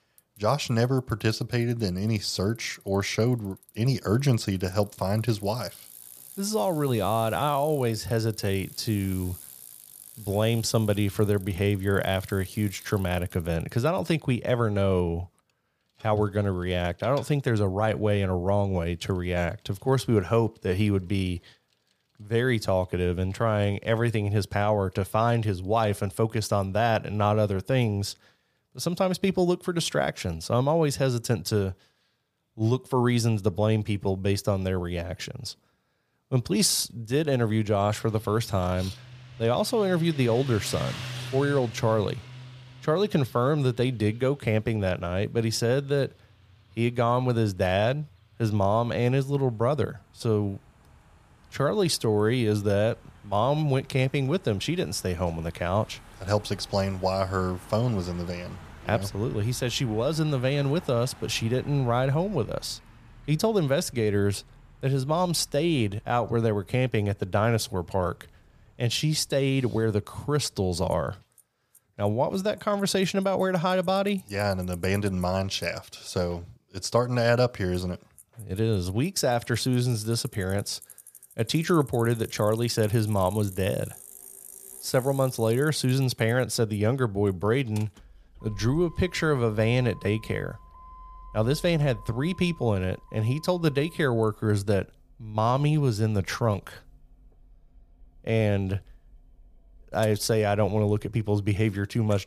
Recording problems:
traffic noise; faint; throughout; 20 dB below the speech

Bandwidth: 15 kHz